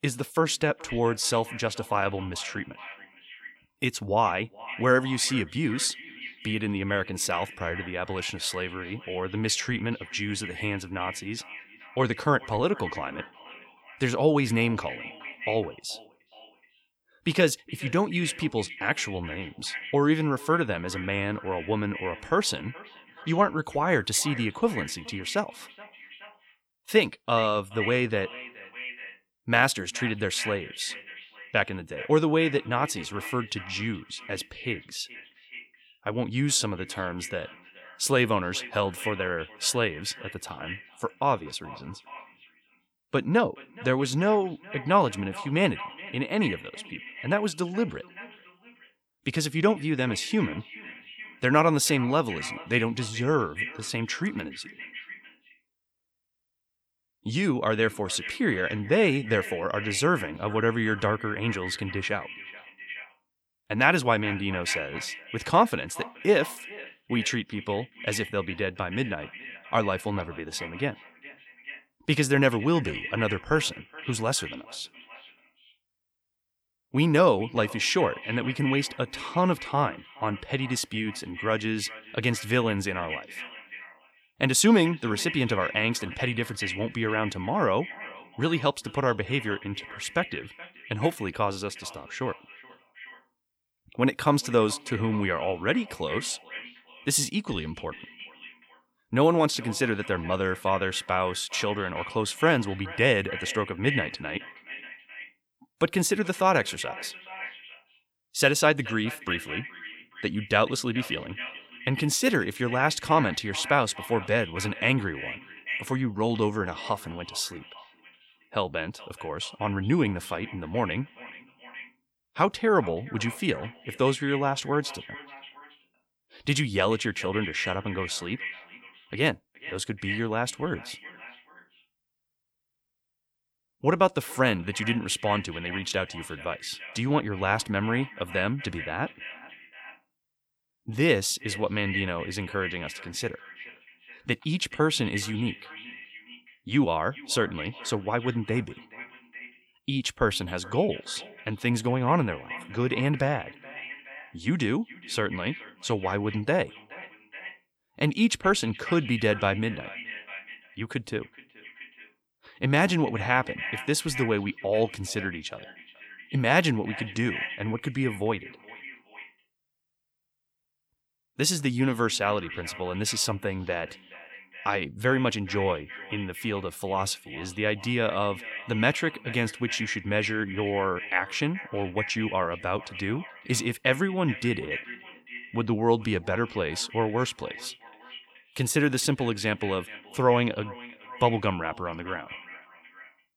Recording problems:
echo of what is said; noticeable; throughout; 420 ms later, 15 dB below the speech

